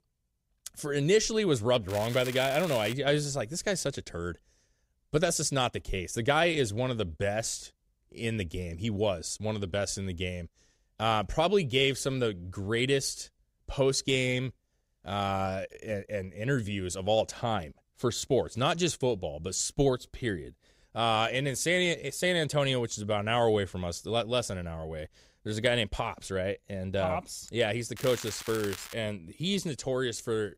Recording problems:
crackling; noticeable; from 2 to 3 s and at 28 s; 10 dB below the speech

